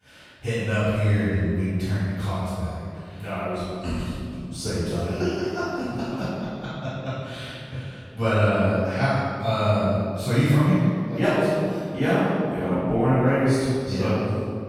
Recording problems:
room echo; strong; dies away in 2.1 s
off-mic speech; far

